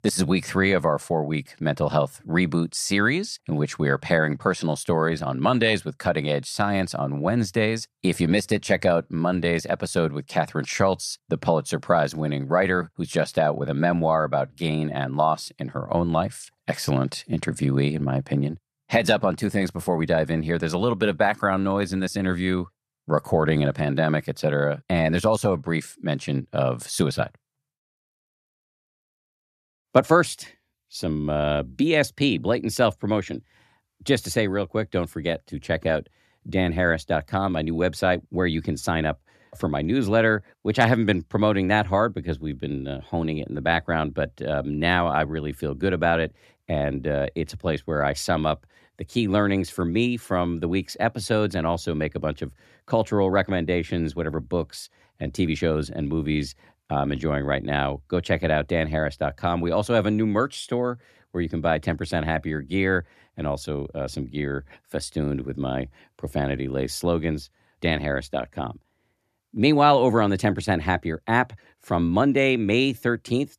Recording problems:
none

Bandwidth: 14 kHz